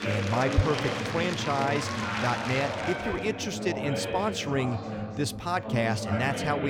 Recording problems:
chatter from many people; loud; throughout; 2 dB below the speech
abrupt cut into speech; at the end

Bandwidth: 18.5 kHz